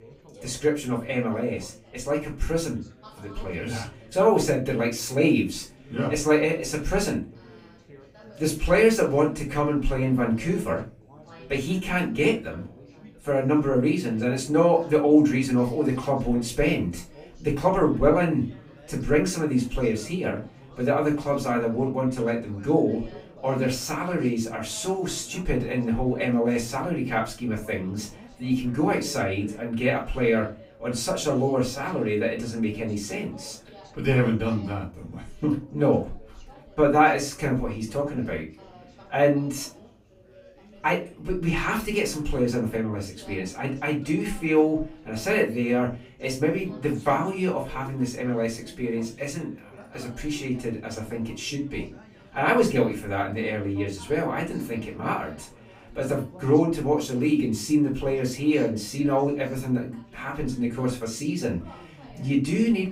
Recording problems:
off-mic speech; far
room echo; slight; dies away in 0.3 s
background chatter; faint; throughout; 4 voices, 25 dB below the speech

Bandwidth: 15.5 kHz